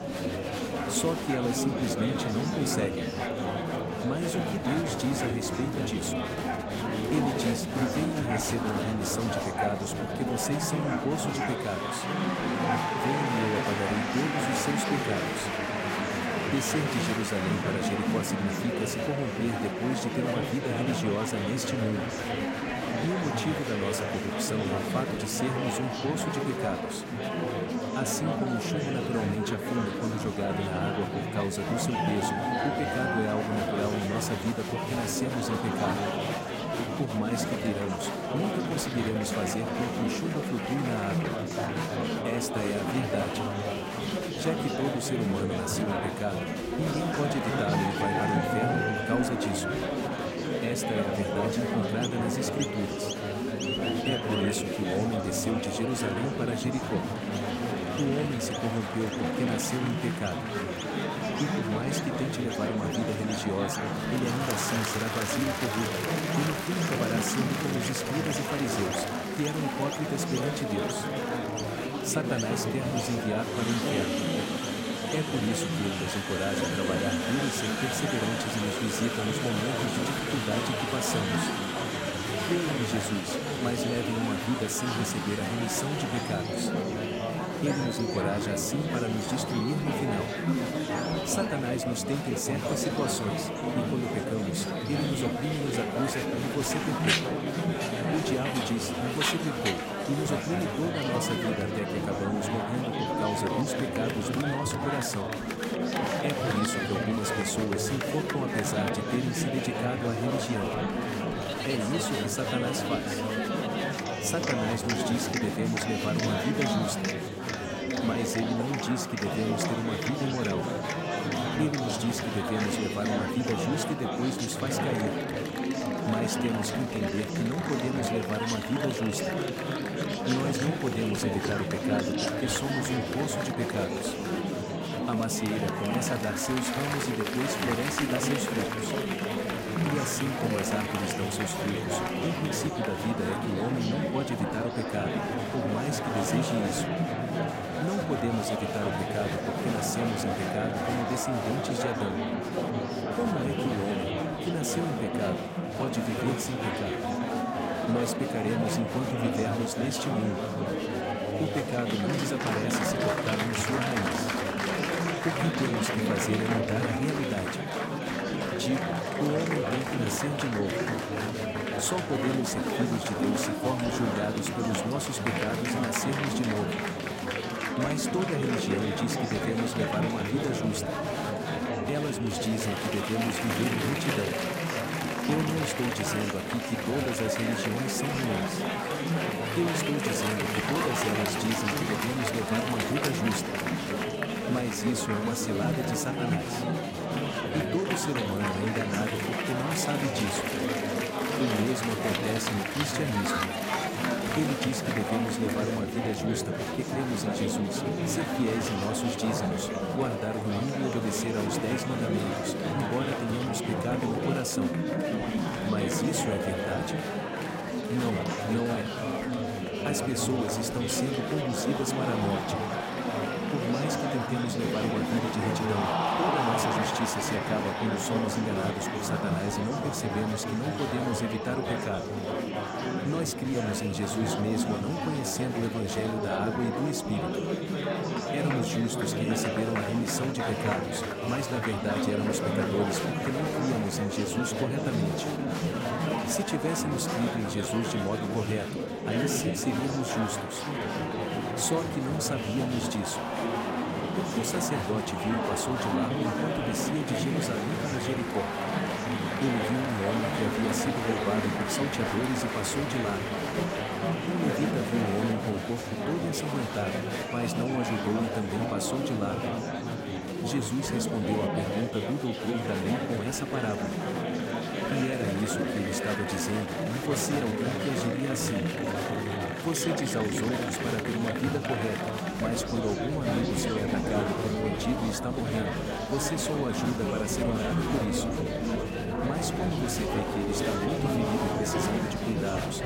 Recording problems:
murmuring crowd; very loud; throughout; 2 dB above the speech
animal sounds; noticeable; throughout; 10 dB below the speech

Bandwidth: 16 kHz